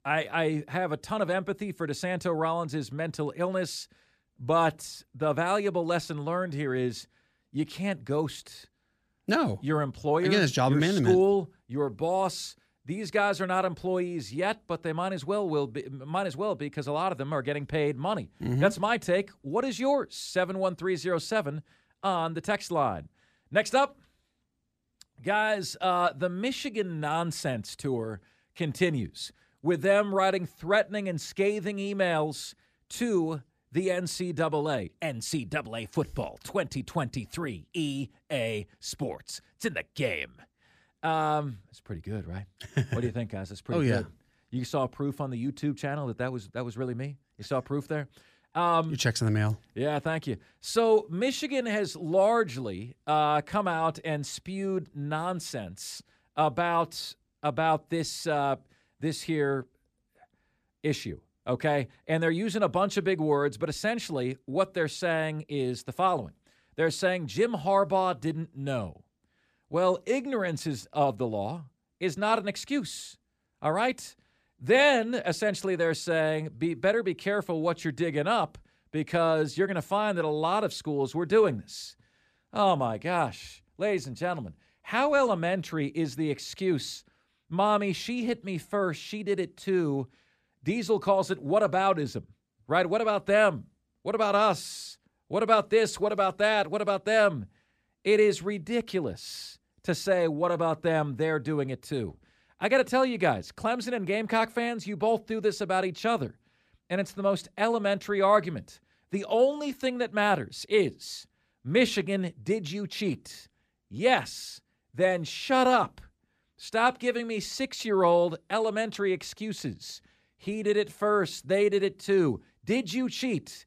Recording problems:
none

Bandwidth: 14.5 kHz